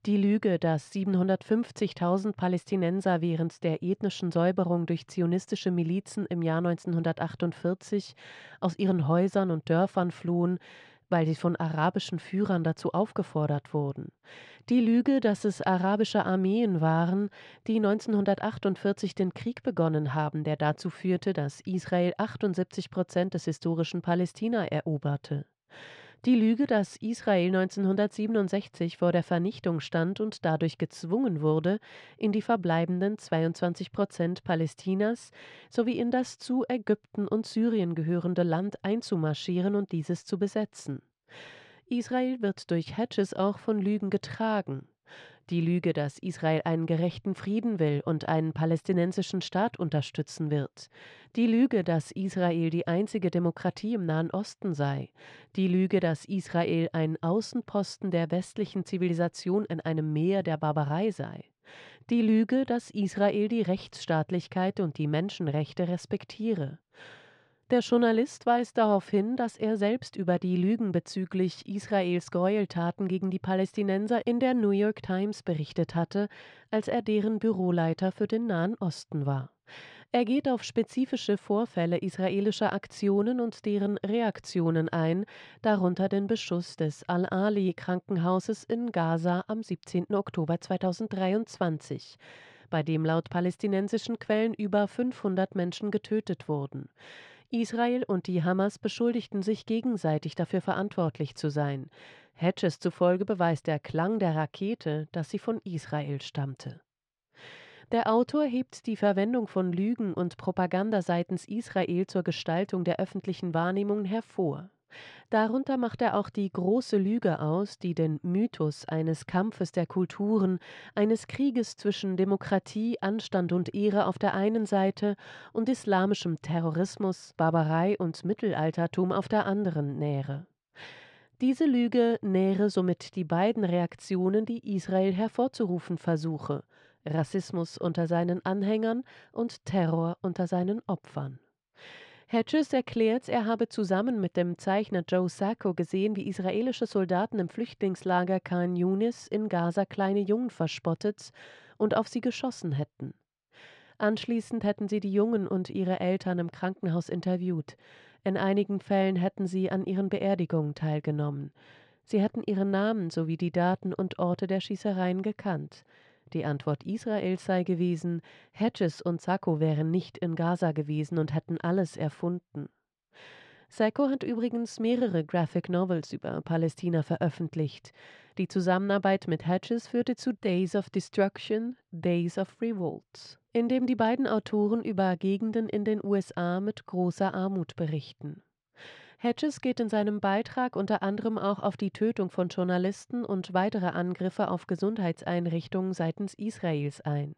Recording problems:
muffled; slightly; fading above 3.5 kHz

